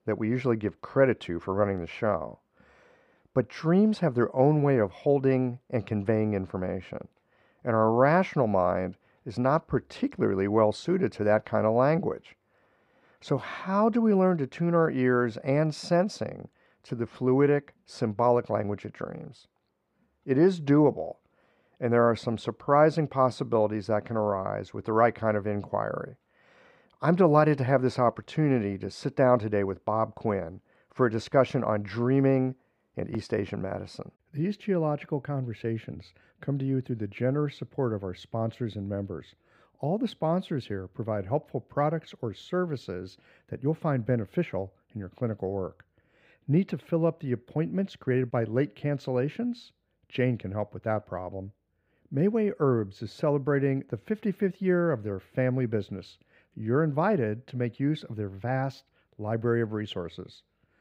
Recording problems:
muffled; very; fading above 3 kHz

